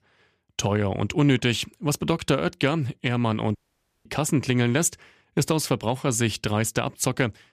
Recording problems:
audio cutting out; at 3.5 s for 0.5 s

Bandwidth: 14.5 kHz